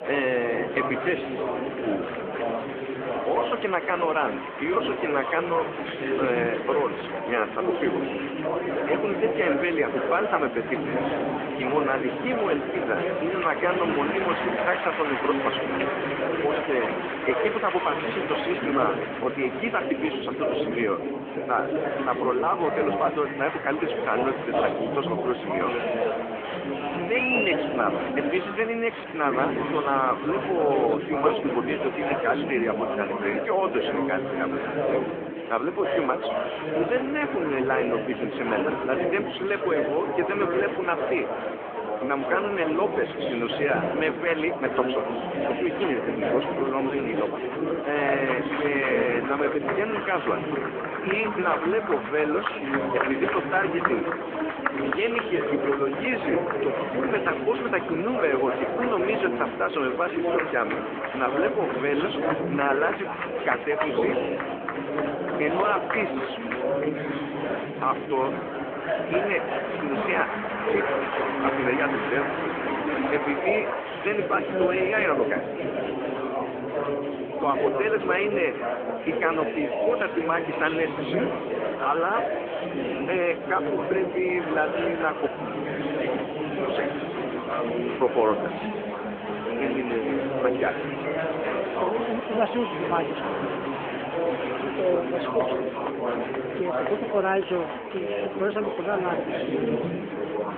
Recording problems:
phone-call audio; nothing above 3.5 kHz
murmuring crowd; loud; throughout; 1 dB below the speech
animal sounds; faint; throughout; 30 dB below the speech

